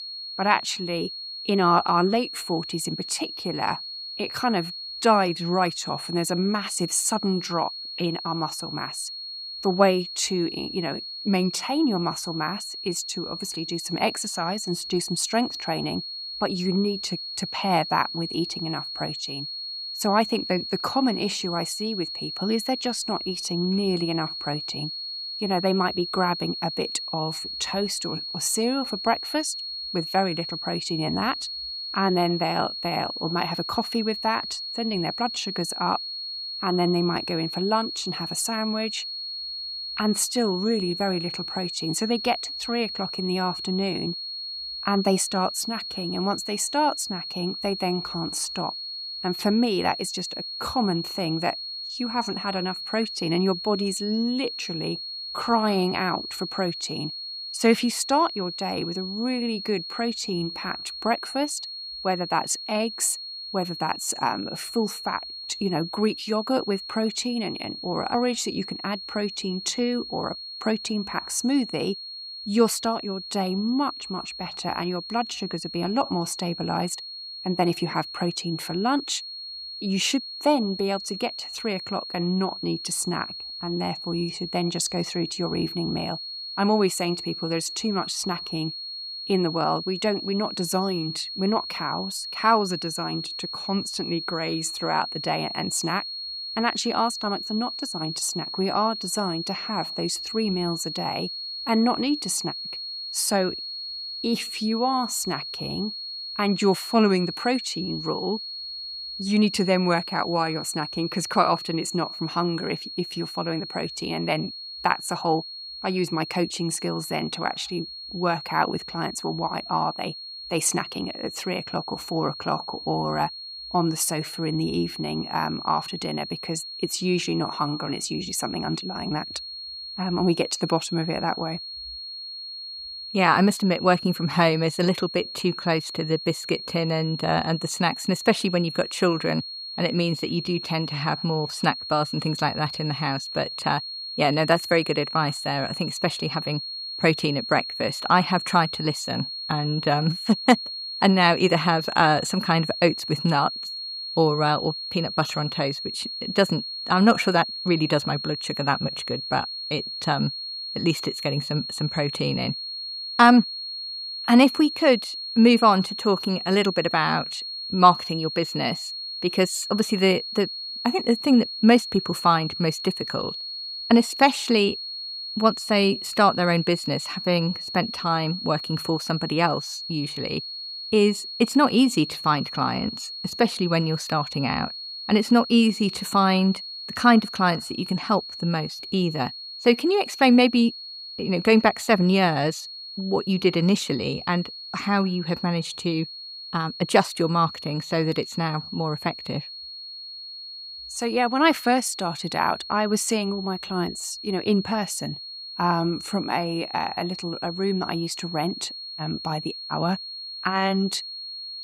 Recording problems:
high-pitched whine; loud; throughout; 4.5 kHz, 7 dB below the speech

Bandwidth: 15.5 kHz